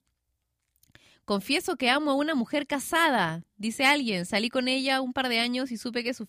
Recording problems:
none

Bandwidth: 15 kHz